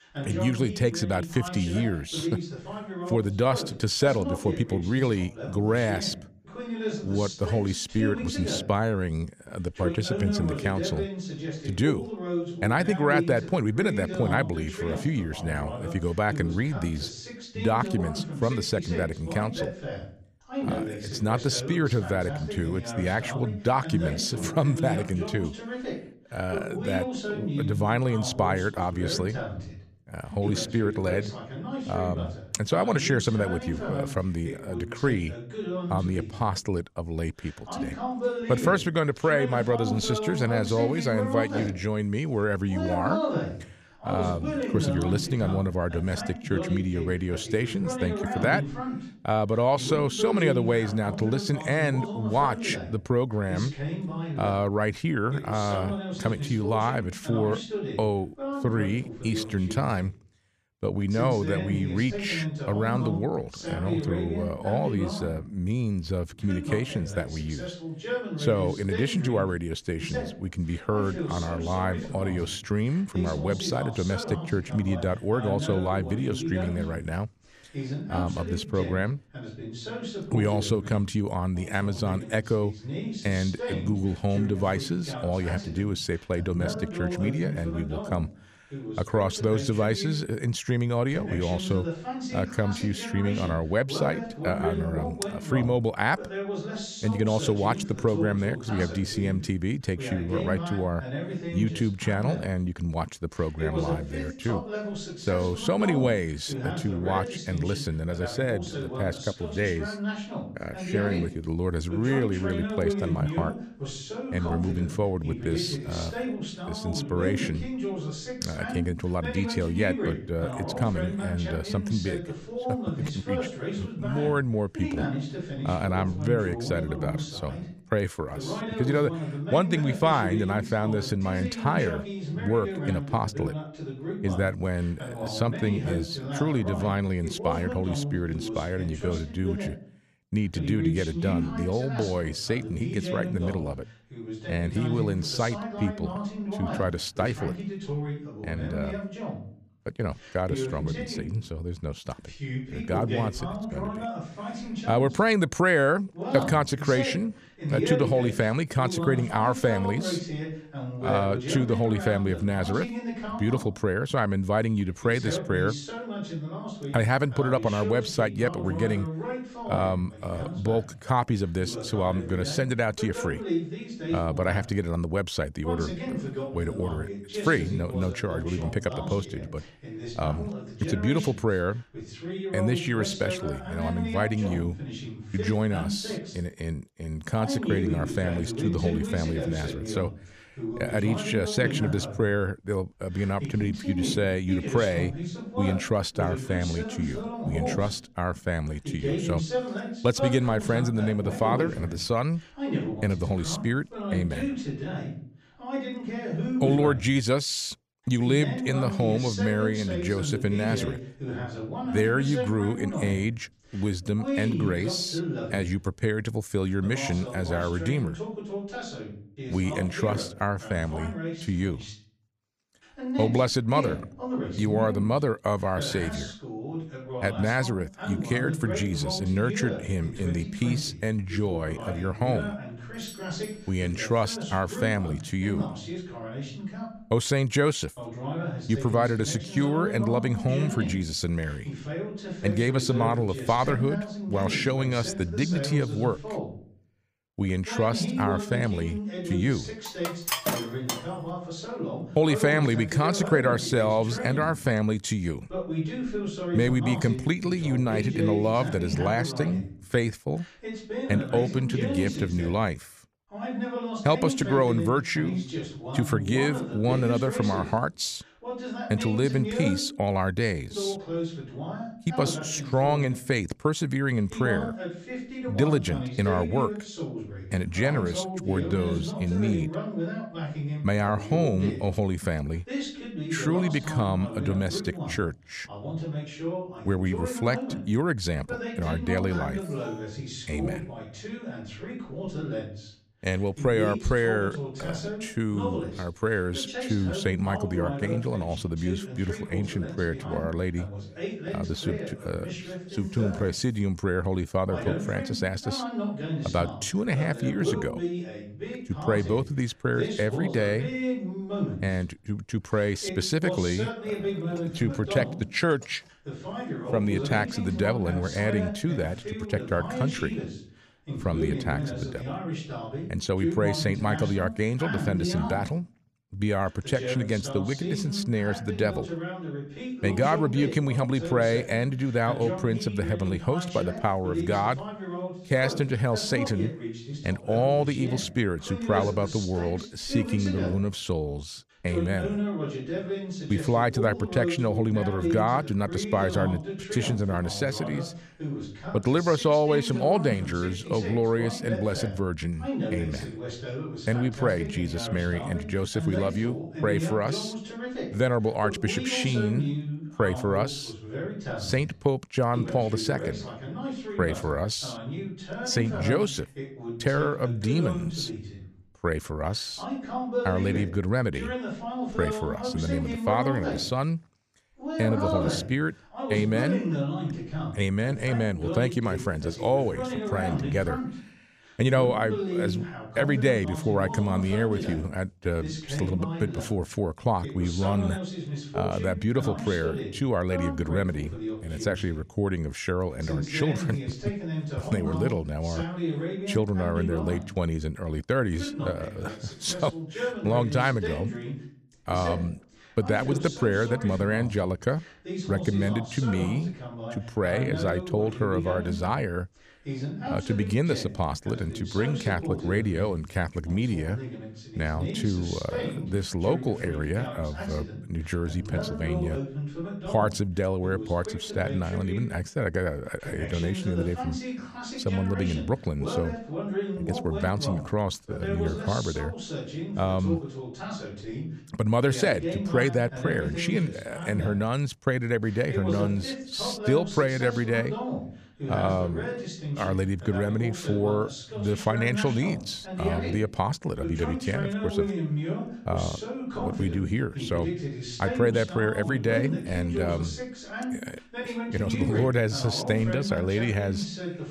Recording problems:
voice in the background; loud; throughout; 6 dB below the speech
doorbell; faint; at 3:53; peak 20 dB below the speech
clattering dishes; loud; from 4:10 to 4:11; peak 1 dB above the speech
alarm; faint; at 4:50; peak 20 dB below the speech

